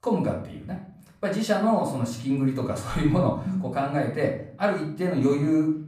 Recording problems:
room echo; slight; dies away in 0.5 s
off-mic speech; somewhat distant

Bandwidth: 15 kHz